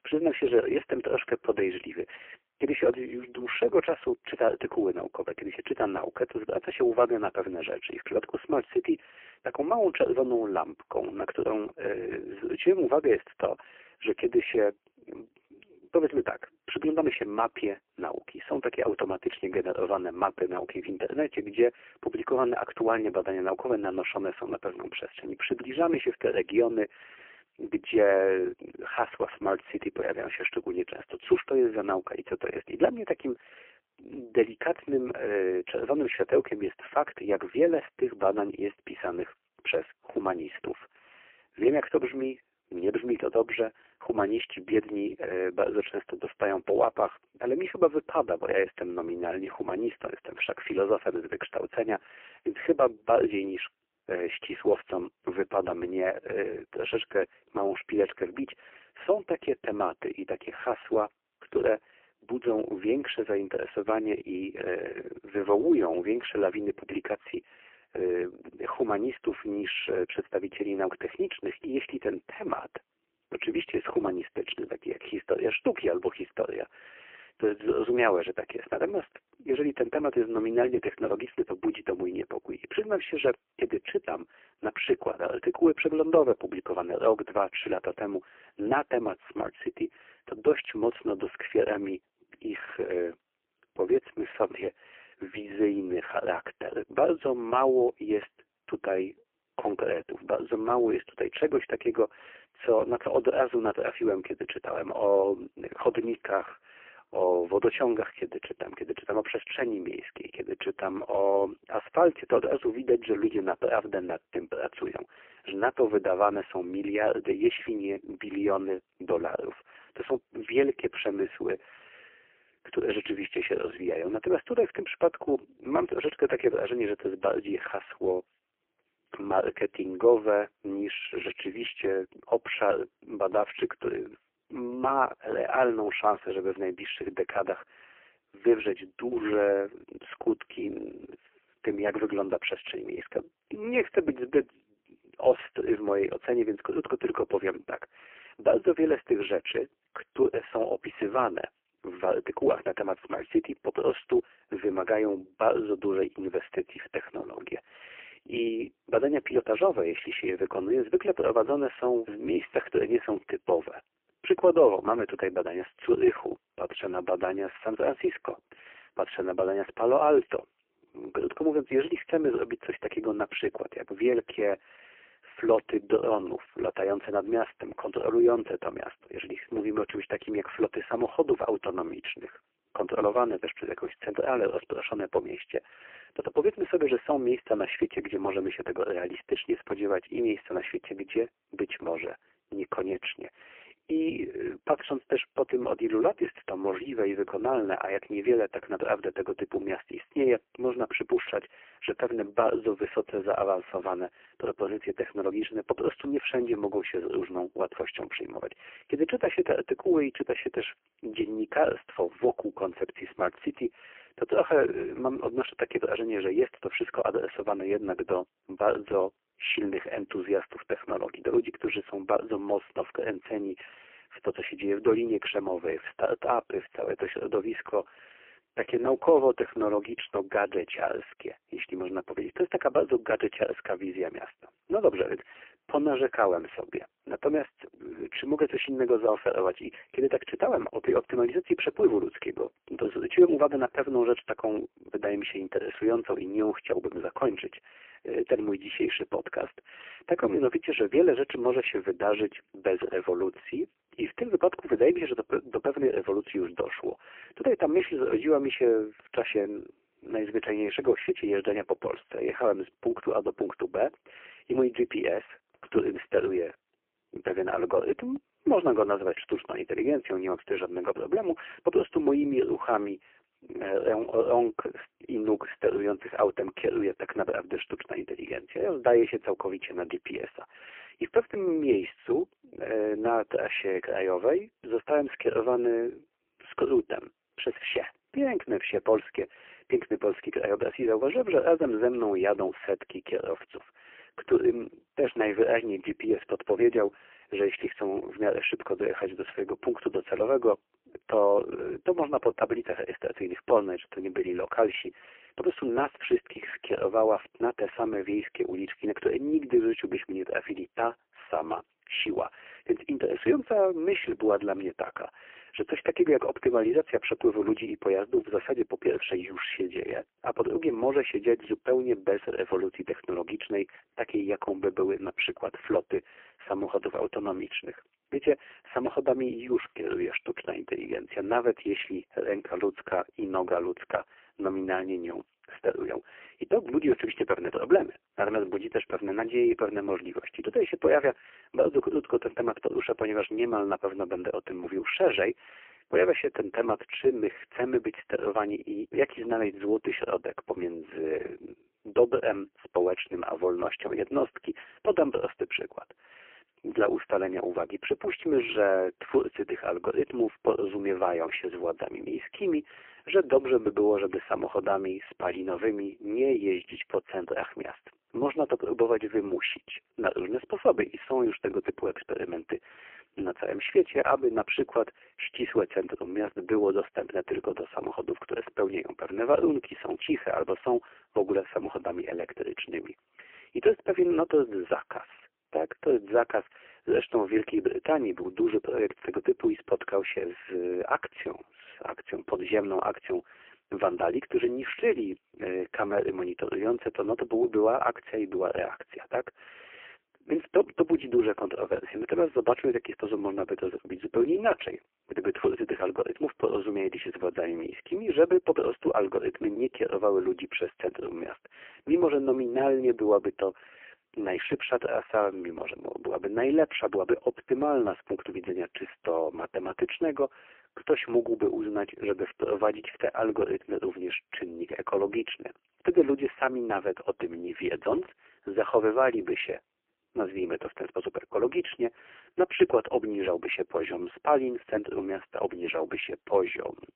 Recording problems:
phone-call audio; poor line; nothing above 3 kHz

